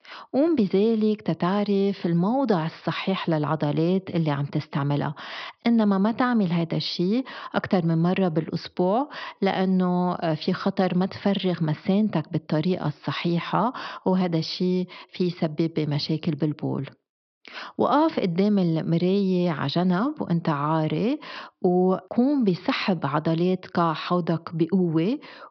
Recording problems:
high frequencies cut off; noticeable; nothing above 5.5 kHz

